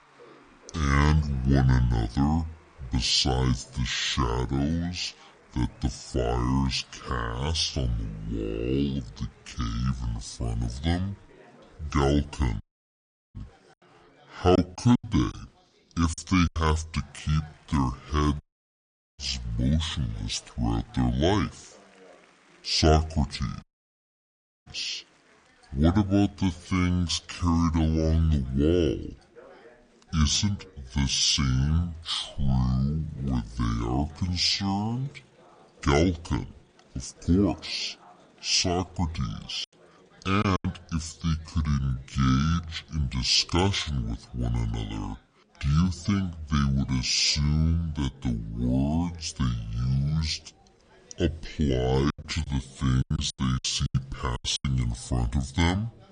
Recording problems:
wrong speed and pitch; too slow and too low; 0.6 times normal speed
chatter from many people; faint; throughout; 30 dB below the speech
audio cutting out; at 13 s for 0.5 s, at 18 s for 1 s and at 24 s for 1 s
choppy; very; from 15 to 17 s, from 40 to 41 s and from 52 to 55 s; 17% of the speech affected

